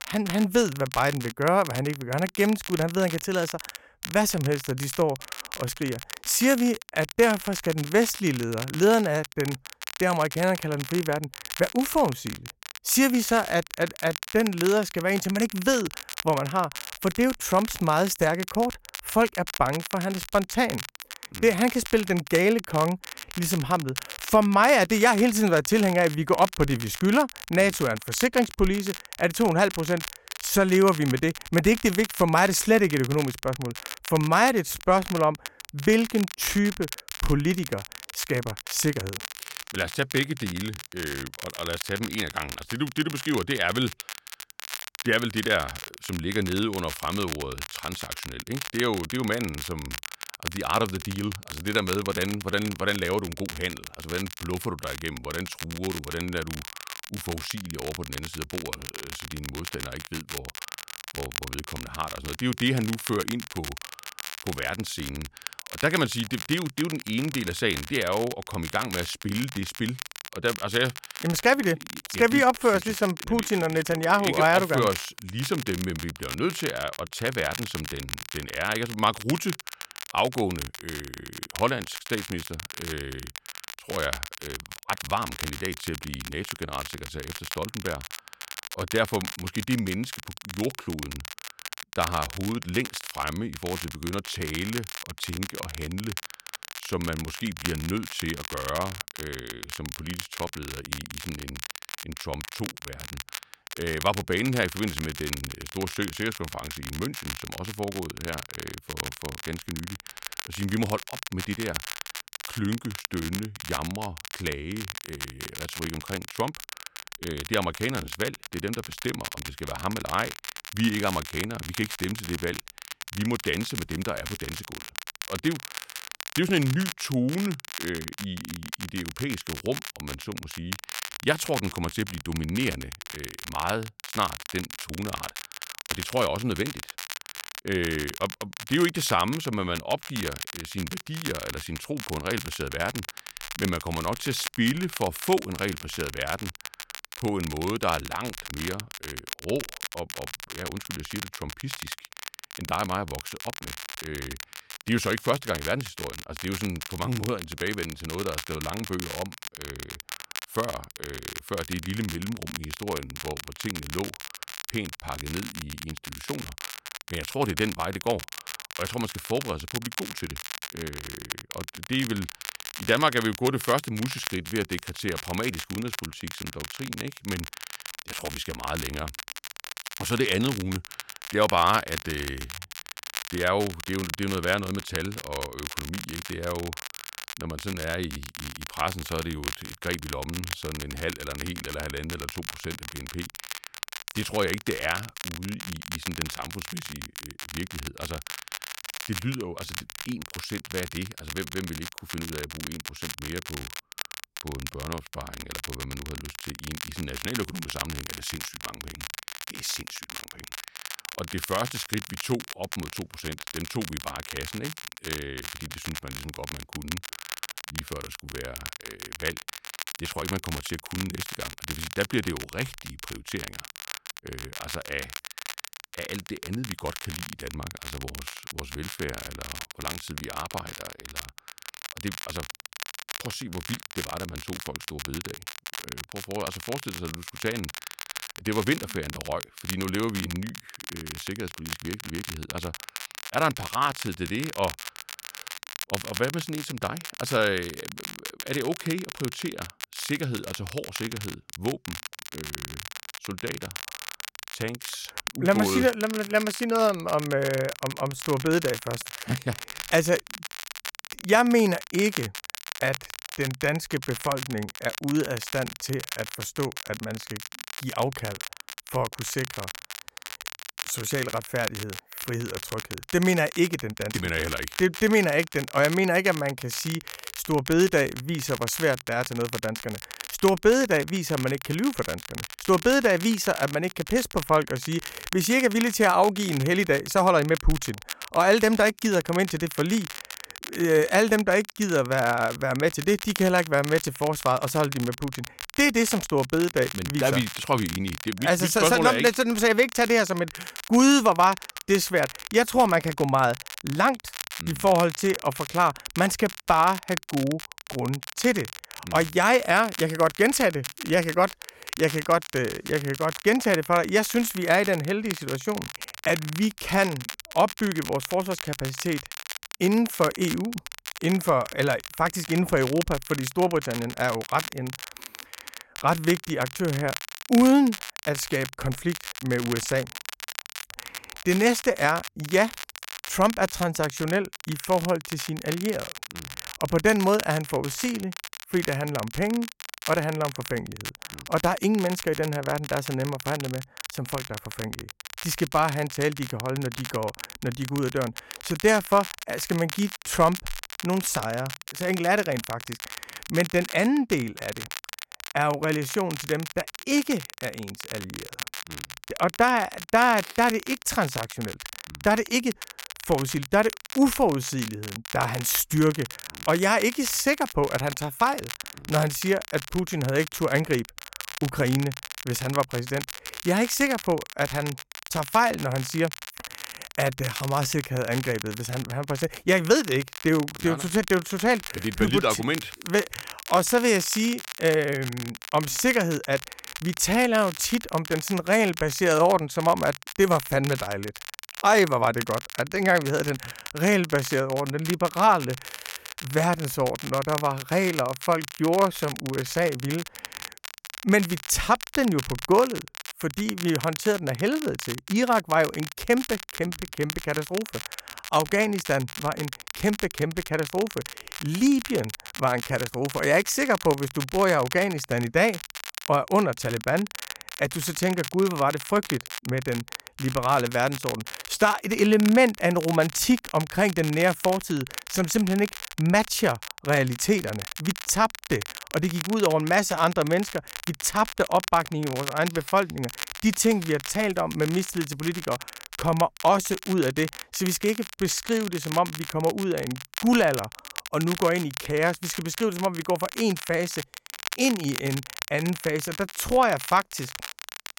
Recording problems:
crackle, like an old record; noticeable; 10 dB below the speech

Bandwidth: 16.5 kHz